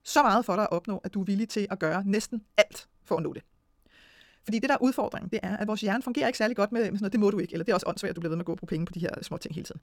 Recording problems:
wrong speed, natural pitch; too fast; 1.7 times normal speed

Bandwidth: 18 kHz